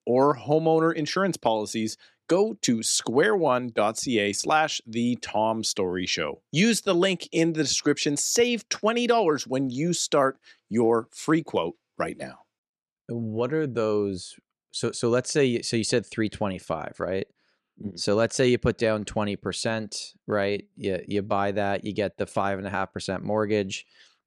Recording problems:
none

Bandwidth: 13.5 kHz